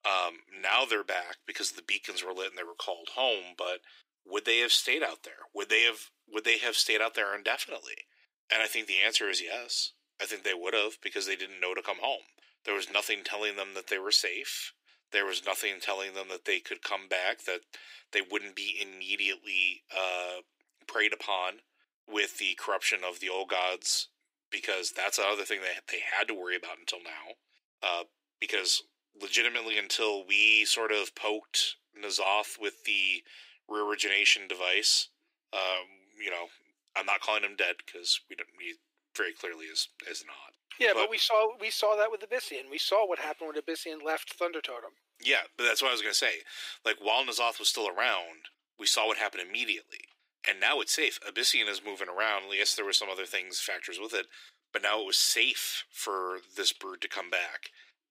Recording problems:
thin; very; fading below 350 Hz

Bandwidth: 15.5 kHz